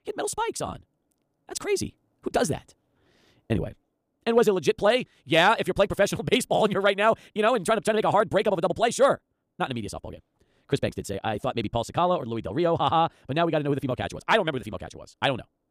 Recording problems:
wrong speed, natural pitch; too fast; 1.7 times normal speed

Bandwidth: 15 kHz